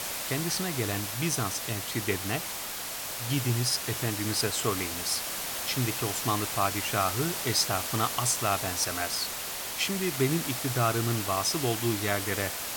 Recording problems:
hiss; loud; throughout; 2 dB below the speech

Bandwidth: 17 kHz